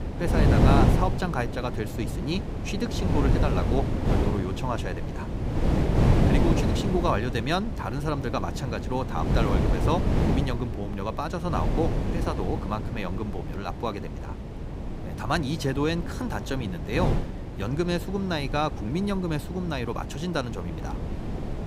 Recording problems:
wind noise on the microphone; heavy; 3 dB below the speech

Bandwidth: 15.5 kHz